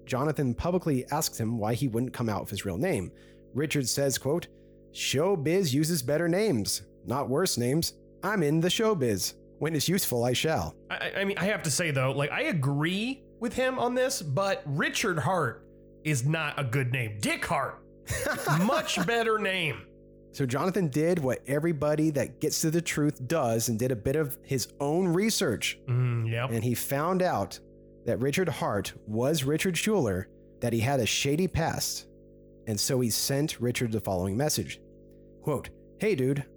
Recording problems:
electrical hum; faint; throughout; 50 Hz, 25 dB below the speech

